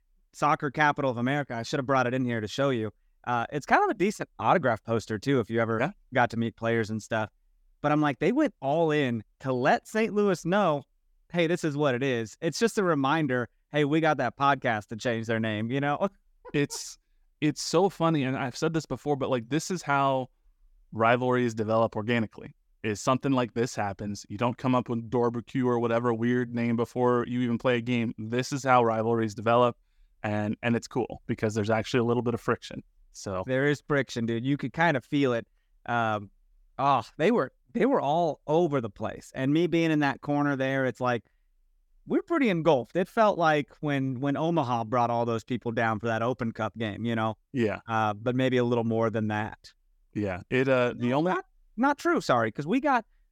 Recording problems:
none

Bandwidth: 17.5 kHz